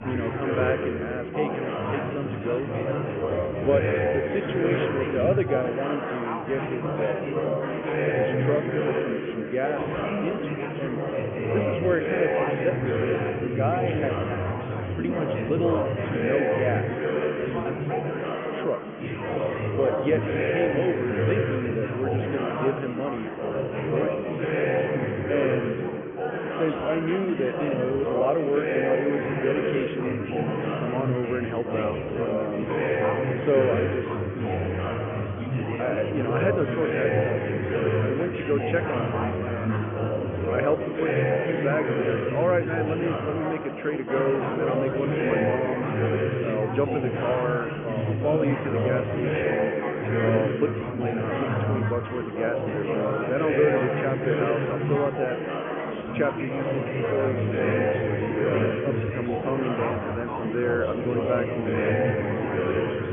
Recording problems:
high frequencies cut off; severe; nothing above 3 kHz
chatter from many people; very loud; throughout; 2 dB above the speech

